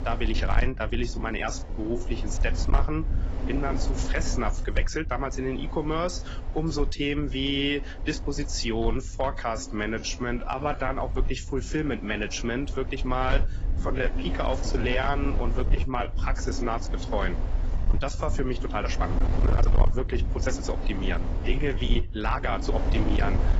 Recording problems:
garbled, watery; badly; nothing above 7.5 kHz
distortion; slight; 4% of the sound clipped
wind noise on the microphone; occasional gusts; 10 dB below the speech
uneven, jittery; strongly; from 1 to 23 s

